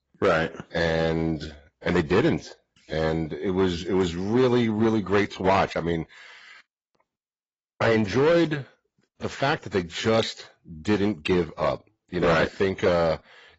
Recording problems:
garbled, watery; badly; nothing above 7.5 kHz
distortion; slight; 4% of the sound clipped

